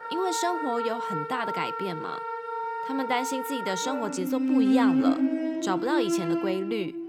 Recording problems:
background music; very loud; throughout; 2 dB above the speech

